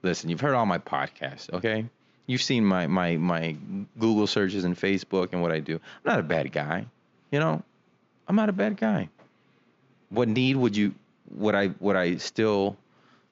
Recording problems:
high frequencies cut off; noticeable; nothing above 7 kHz

